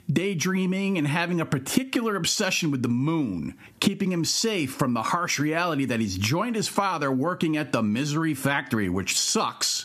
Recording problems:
squashed, flat; somewhat

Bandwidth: 14.5 kHz